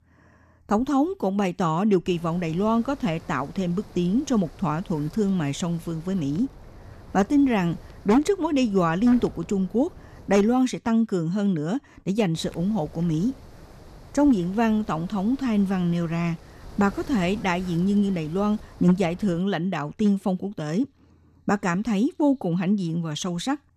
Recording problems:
wind noise on the microphone; occasional gusts; from 2 to 11 s and from 12 to 19 s; 20 dB below the speech

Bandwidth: 14 kHz